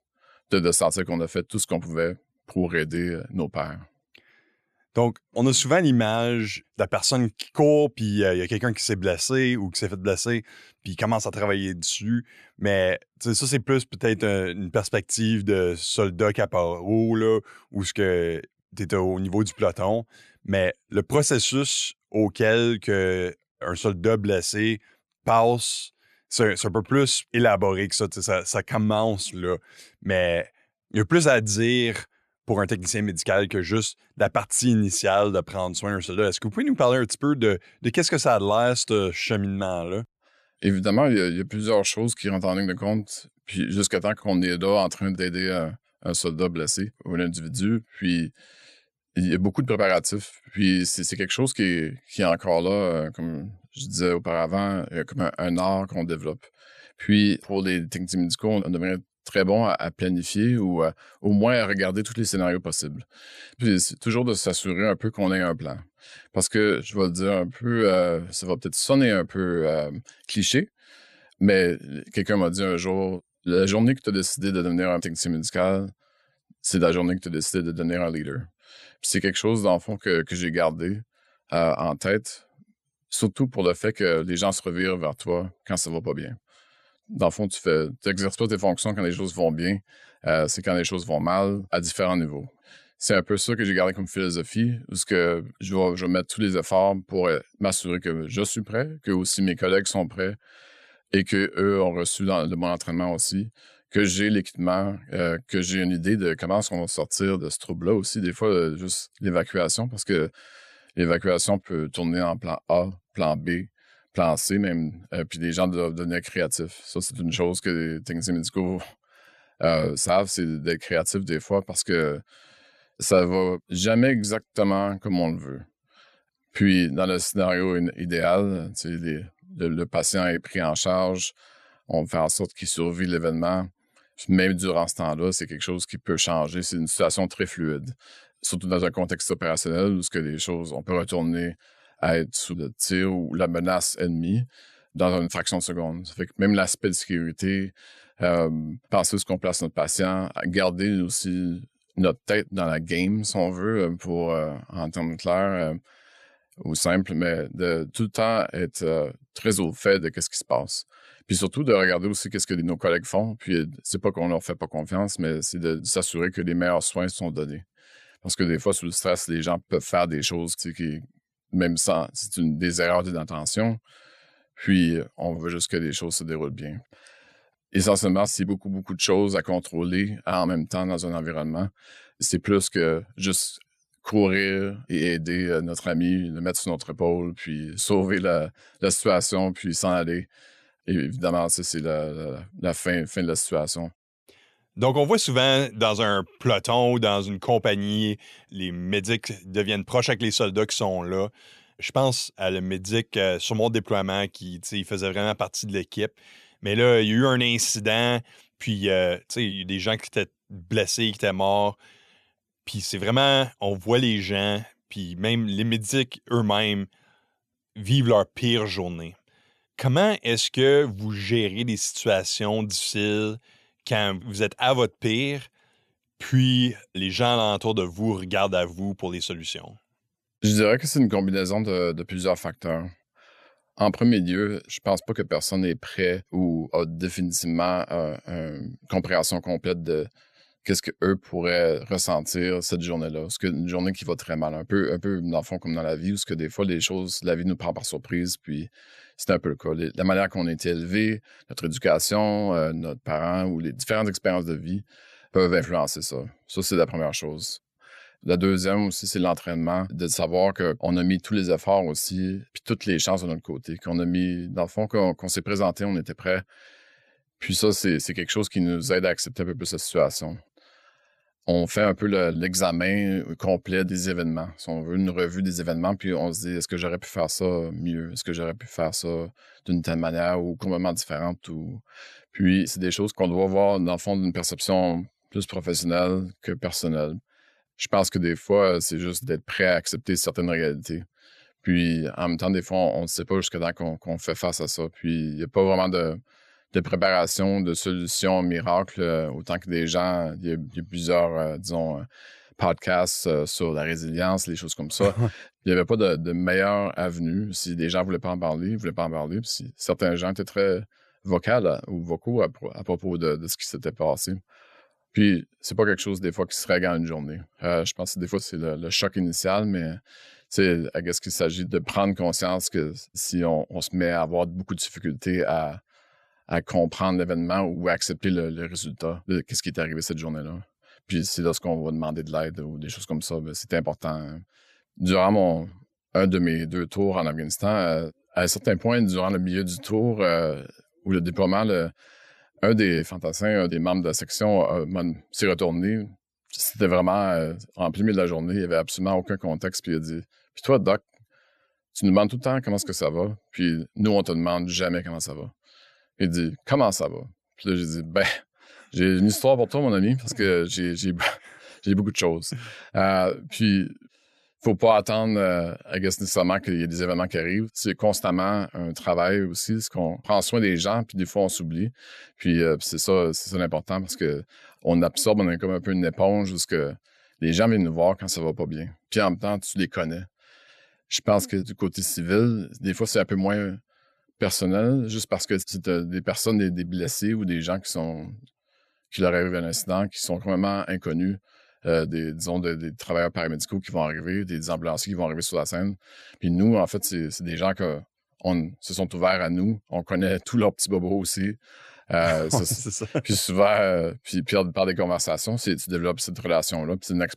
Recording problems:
none

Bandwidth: 13.5 kHz